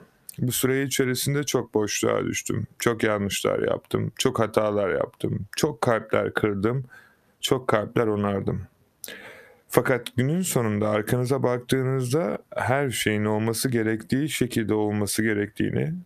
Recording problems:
squashed, flat; heavily

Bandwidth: 14.5 kHz